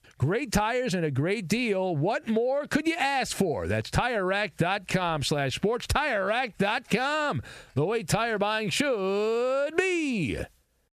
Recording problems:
squashed, flat; heavily

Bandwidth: 14.5 kHz